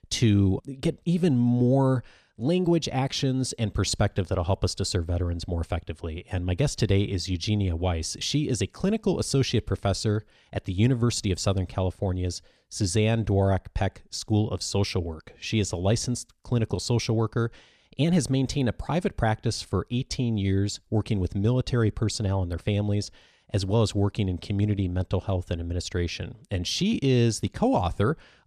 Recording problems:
none

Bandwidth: 14 kHz